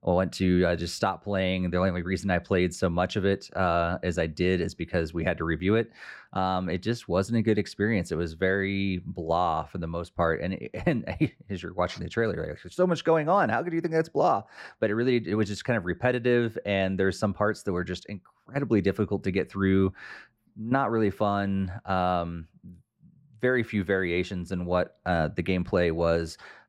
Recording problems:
muffled; slightly; fading above 2.5 kHz

